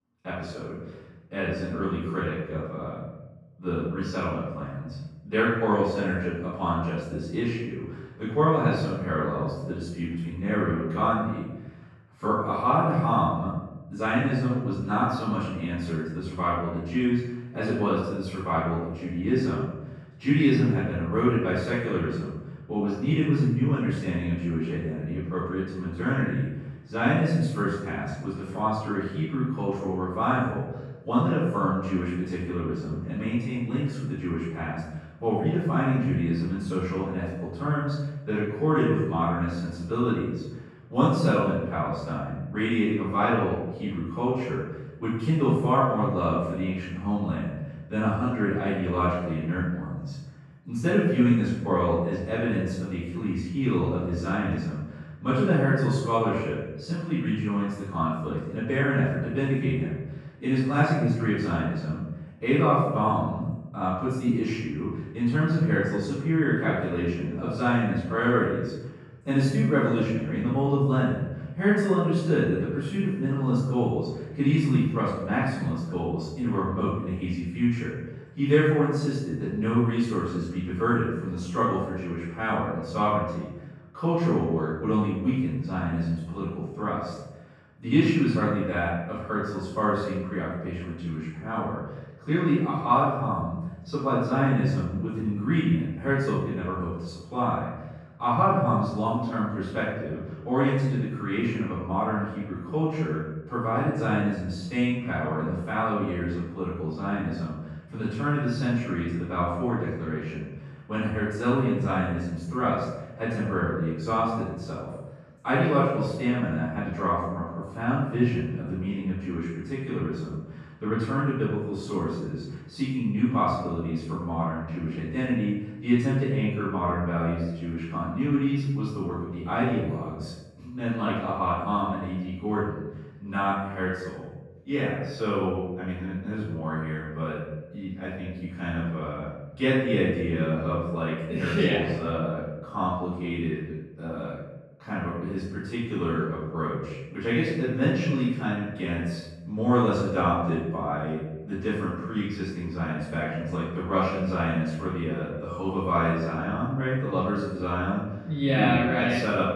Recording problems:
room echo; strong; dies away in 1 s
off-mic speech; far
muffled; slightly; fading above 2.5 kHz

